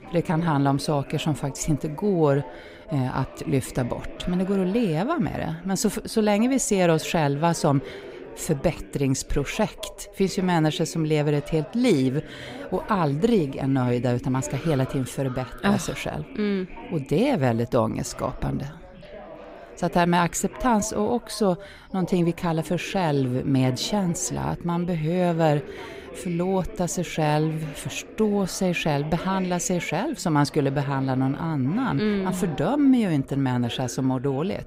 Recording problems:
background chatter; noticeable; throughout; 3 voices, 15 dB below the speech

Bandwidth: 15.5 kHz